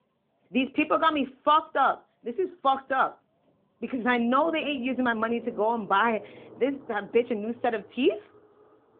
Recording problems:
phone-call audio
traffic noise; faint; throughout; 20 dB below the speech

